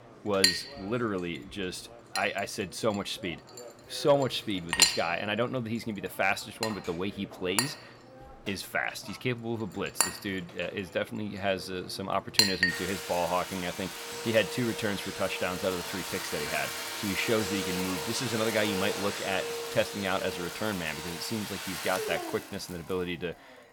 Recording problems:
household noises; very loud; throughout; 1 dB above the speech

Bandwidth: 17.5 kHz